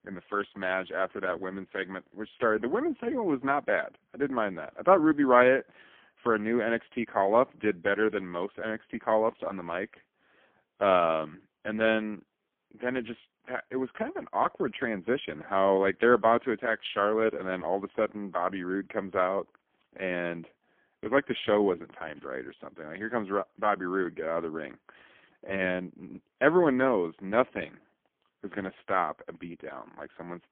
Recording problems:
phone-call audio; poor line; nothing above 3.5 kHz

